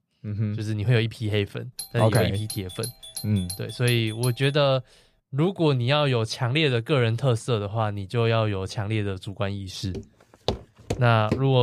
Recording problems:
doorbell; noticeable; from 2 to 4.5 s; peak 10 dB below the speech
footsteps; noticeable; from 10 s on; peak 6 dB below the speech
abrupt cut into speech; at the end

